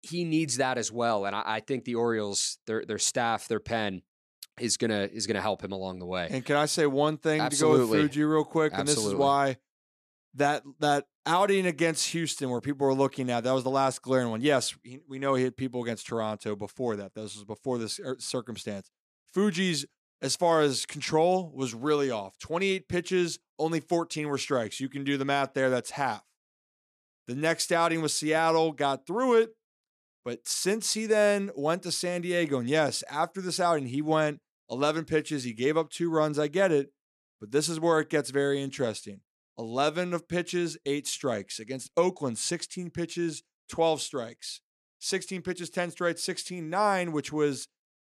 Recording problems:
none

